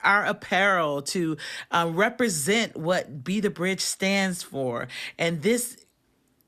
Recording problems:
none

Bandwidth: 14 kHz